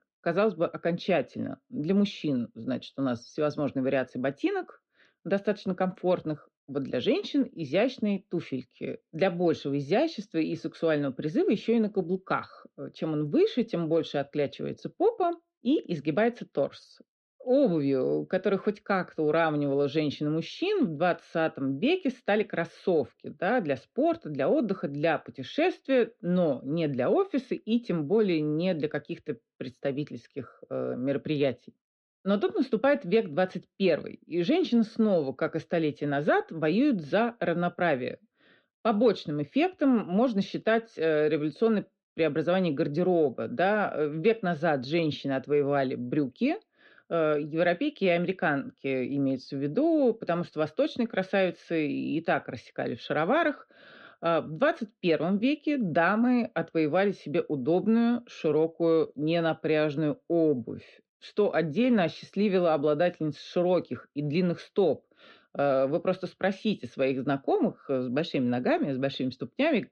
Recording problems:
muffled; slightly; fading above 3.5 kHz

